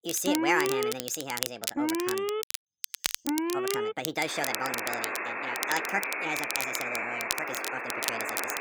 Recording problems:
wrong speed and pitch; too fast and too high; 1.5 times normal speed
alarms or sirens; very loud; throughout; 2 dB above the speech
crackle, like an old record; loud; 1 dB below the speech

